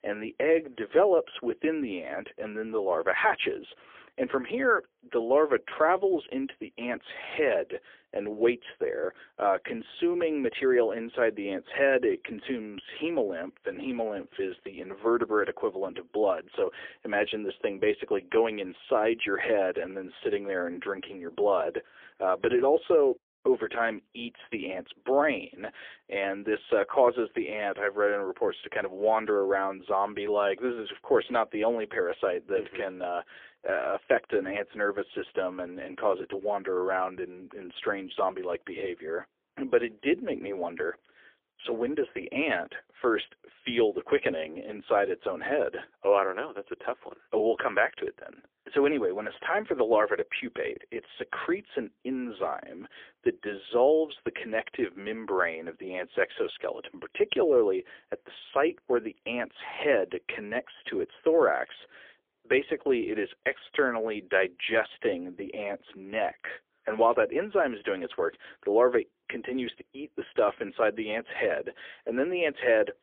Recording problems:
phone-call audio; poor line; nothing above 3.5 kHz

